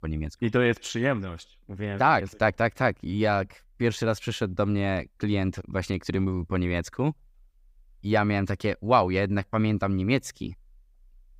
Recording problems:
none

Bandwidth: 15.5 kHz